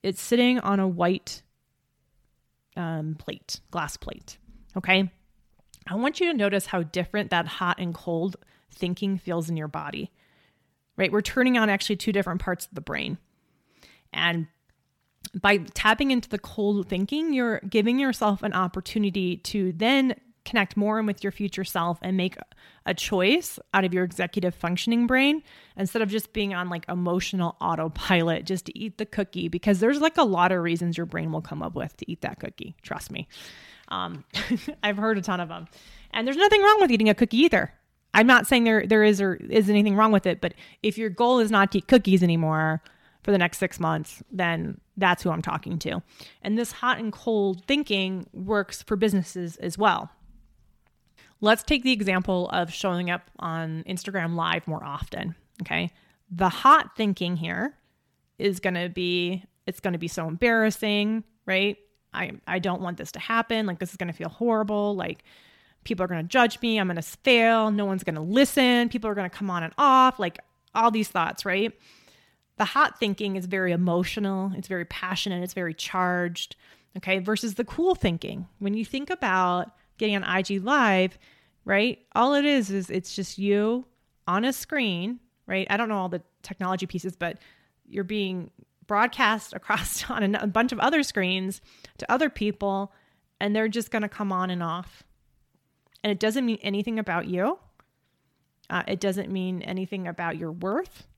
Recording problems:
none

